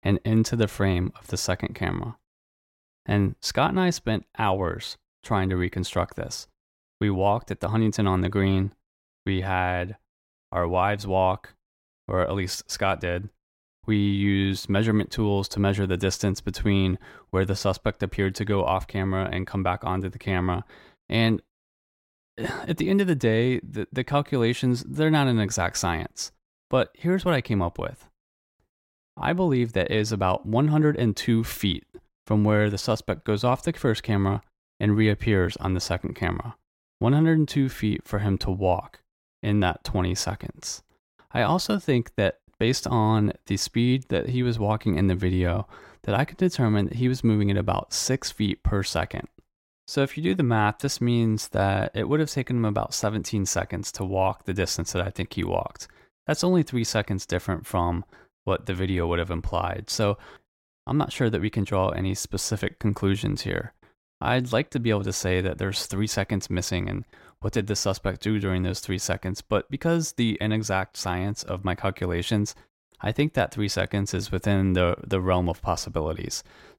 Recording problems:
none

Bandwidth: 16 kHz